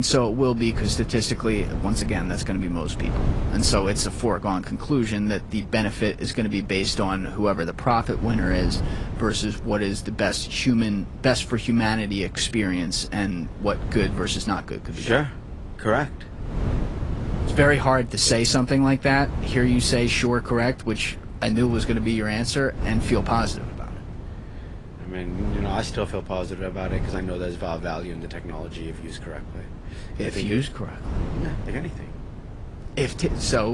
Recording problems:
garbled, watery; slightly; nothing above 10 kHz
wind noise on the microphone; occasional gusts; 15 dB below the speech
abrupt cut into speech; at the start and the end

